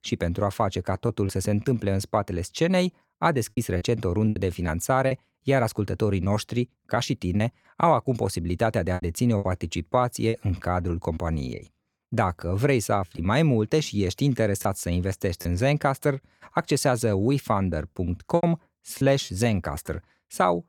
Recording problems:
choppy; occasionally; 5% of the speech affected

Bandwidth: 18 kHz